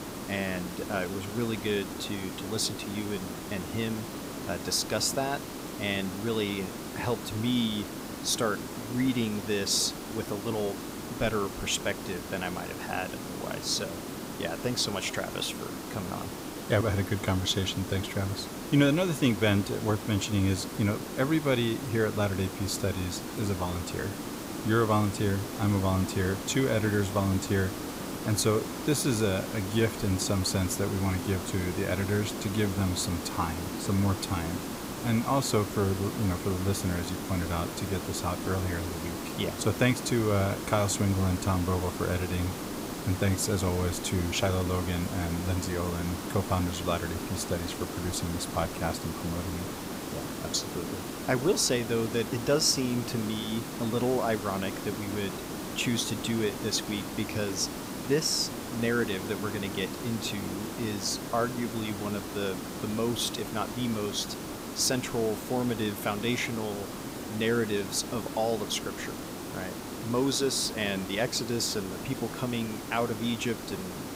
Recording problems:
hiss; loud; throughout; 7 dB below the speech

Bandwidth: 15.5 kHz